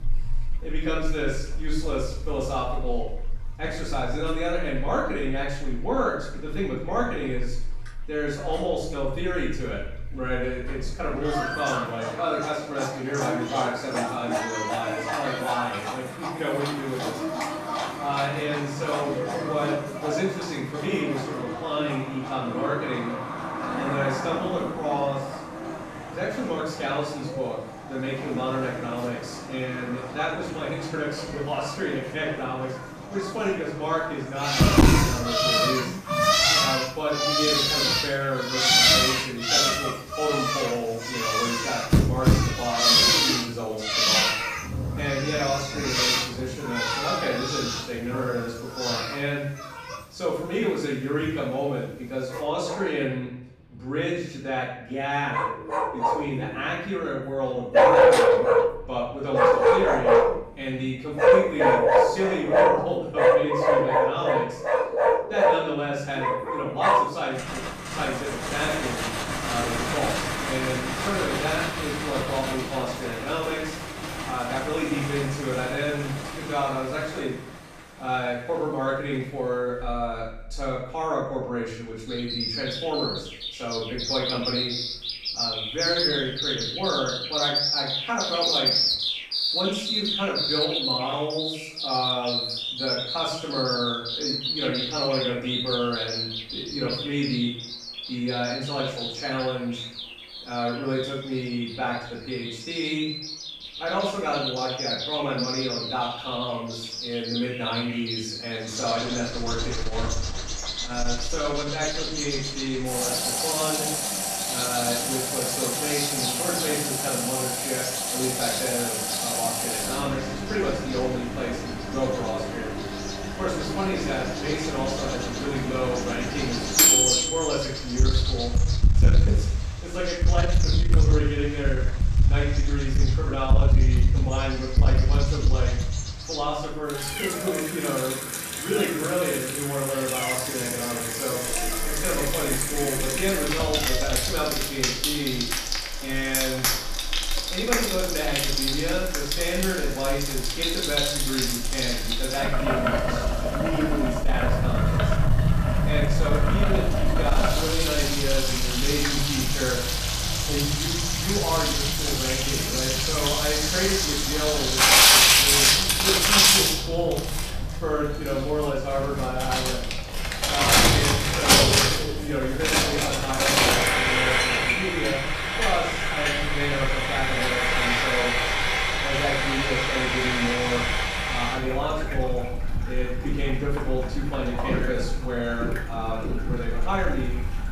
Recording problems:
off-mic speech; far
room echo; noticeable; dies away in 0.6 s
distortion; slight; 10 dB below the speech
animal sounds; very loud; throughout; 2 dB above the speech
household noises; very loud; from 1:49 on; 6 dB above the speech
rain or running water; faint; throughout; 20 dB below the speech

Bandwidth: 14.5 kHz